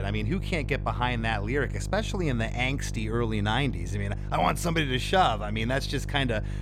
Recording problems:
electrical hum; noticeable; throughout; 50 Hz, 20 dB below the speech
abrupt cut into speech; at the start

